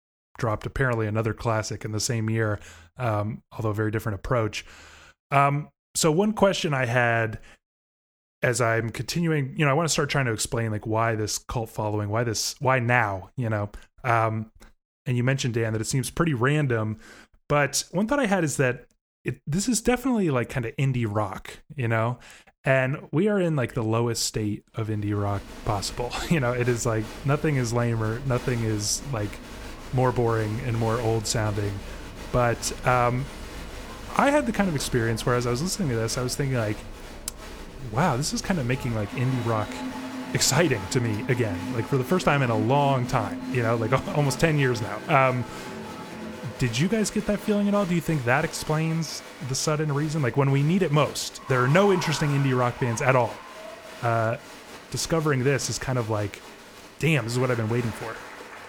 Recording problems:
crowd noise; noticeable; from 25 s on; 15 dB below the speech

